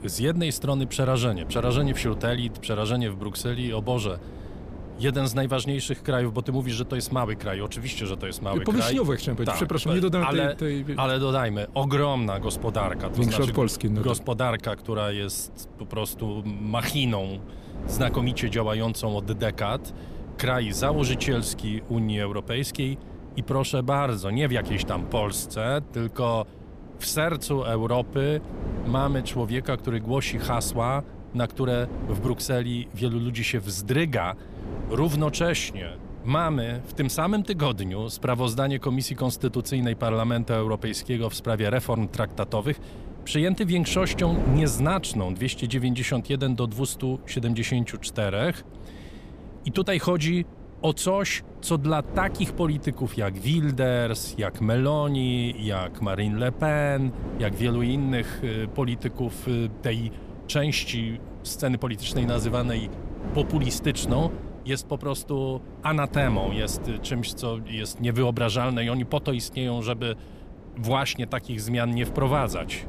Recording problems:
wind noise on the microphone; occasional gusts; 15 dB below the speech

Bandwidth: 14.5 kHz